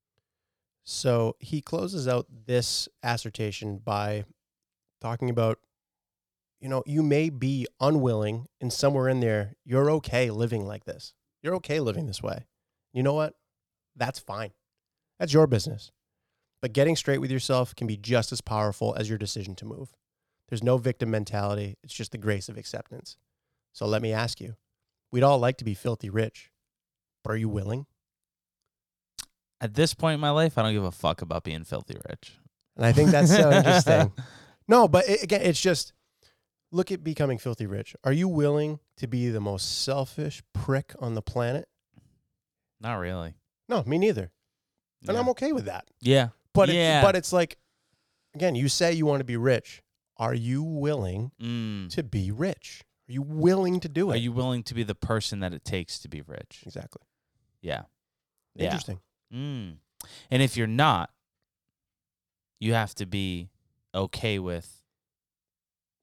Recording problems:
none

